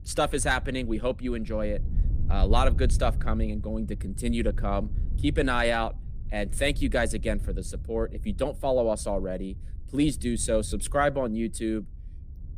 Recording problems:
wind noise on the microphone; occasional gusts; 20 dB below the speech

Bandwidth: 15 kHz